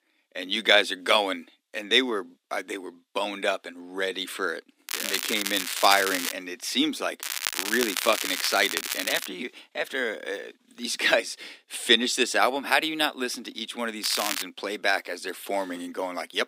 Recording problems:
thin; somewhat; fading below 250 Hz
crackling; loud; from 5 to 6.5 s, from 7 to 9.5 s and at 14 s; 3 dB below the speech

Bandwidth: 15.5 kHz